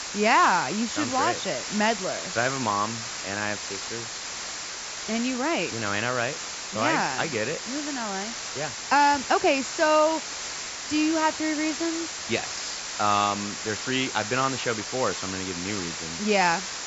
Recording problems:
high frequencies cut off; noticeable; nothing above 8 kHz
hiss; loud; throughout; 6 dB below the speech

